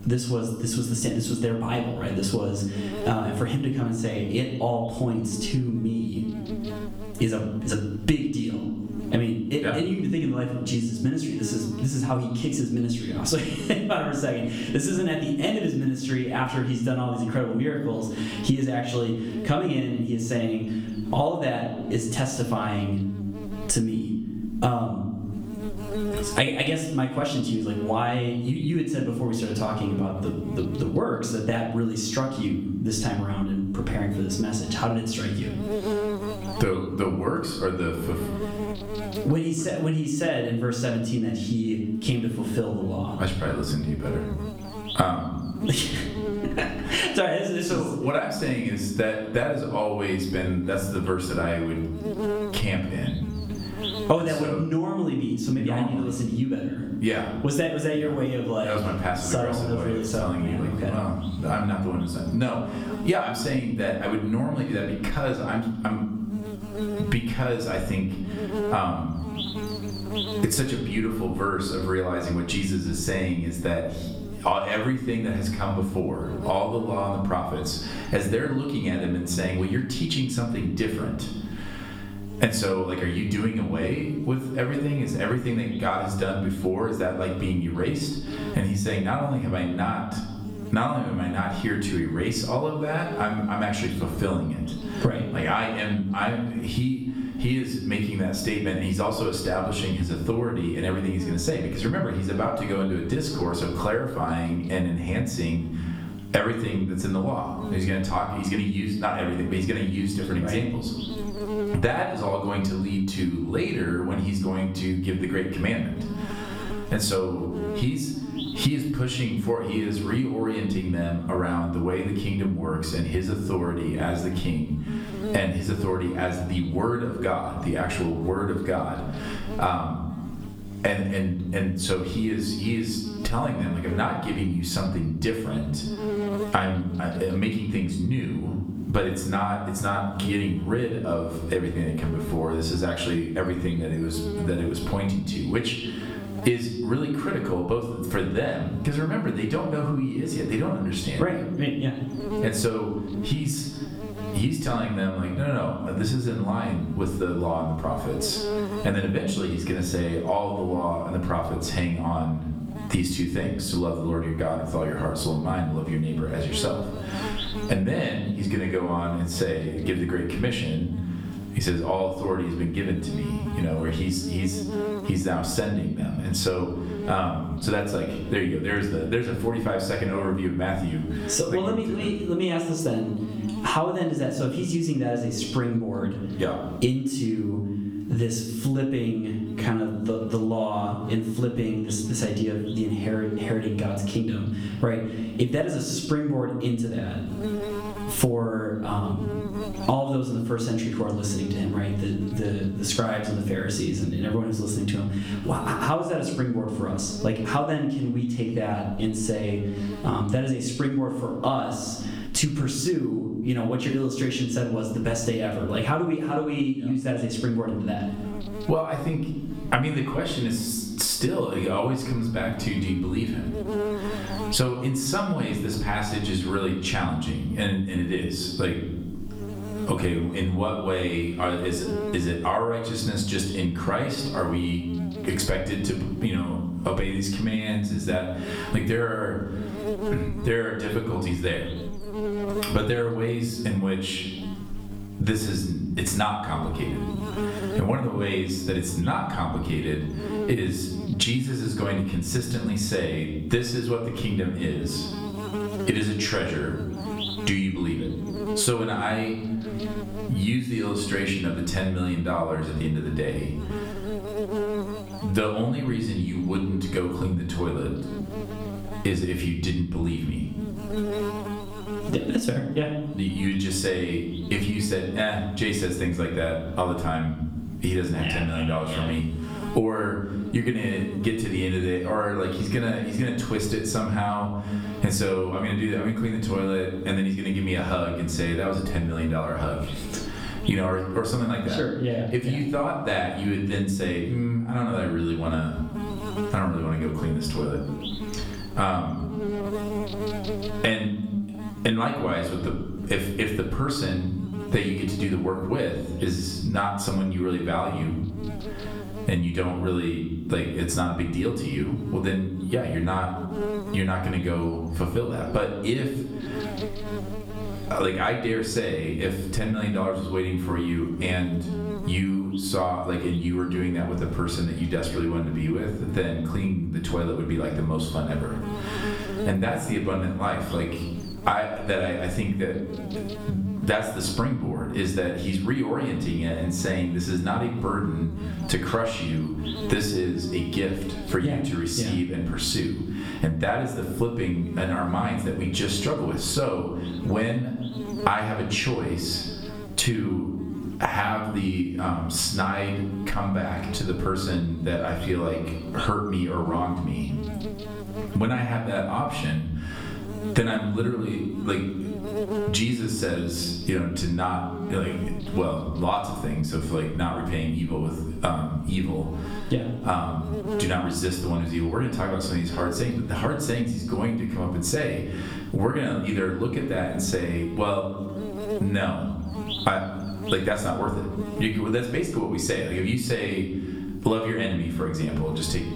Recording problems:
off-mic speech; far
room echo; slight; dies away in 0.6 s
squashed, flat; somewhat
electrical hum; noticeable; throughout; 50 Hz, 10 dB below the speech

